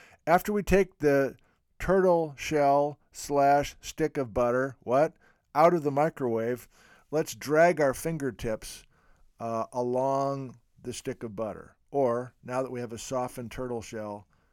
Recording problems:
none

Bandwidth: 18 kHz